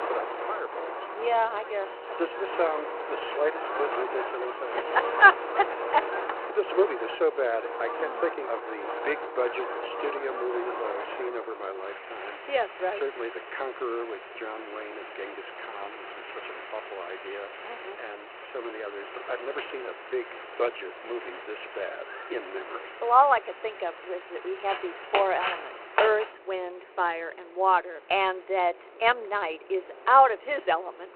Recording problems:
phone-call audio; nothing above 4 kHz
wind in the background; loud; throughout; 8 dB below the speech

